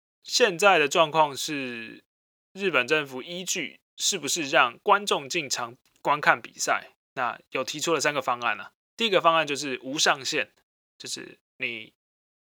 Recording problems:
thin; somewhat; fading below 900 Hz

